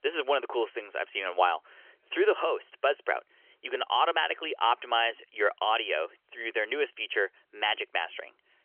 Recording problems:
phone-call audio; nothing above 3 kHz

